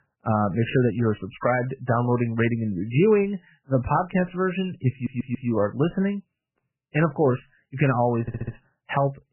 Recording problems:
garbled, watery; badly; nothing above 3 kHz
audio stuttering; at 5 s and at 8 s

